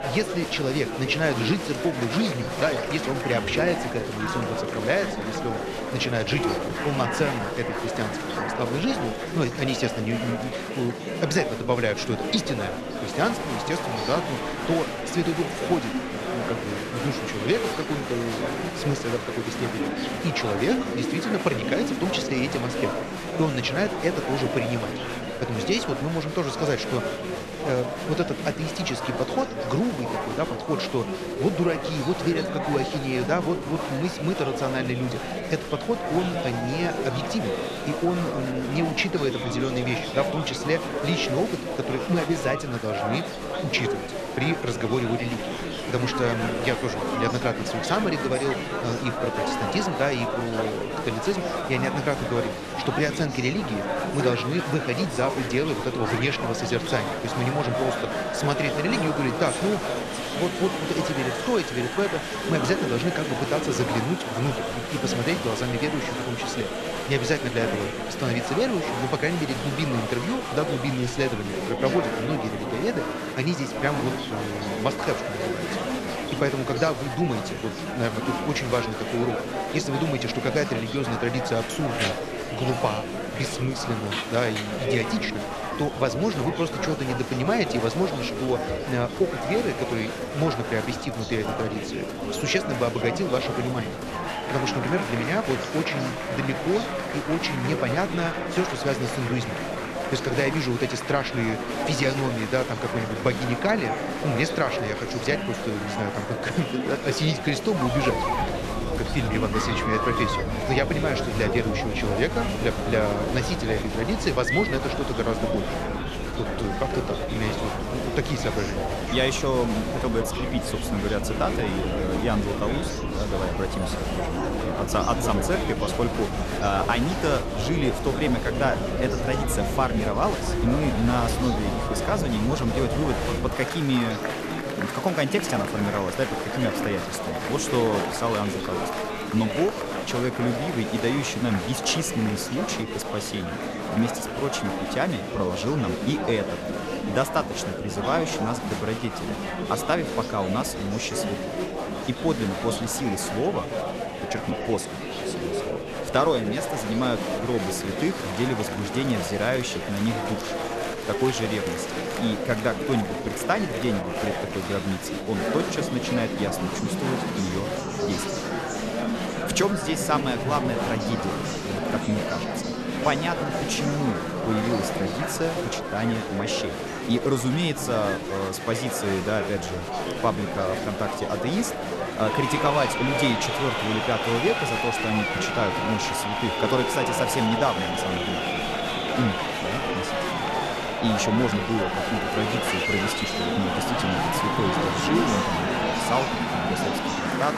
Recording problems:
murmuring crowd; loud; throughout; 1 dB below the speech

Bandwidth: 13.5 kHz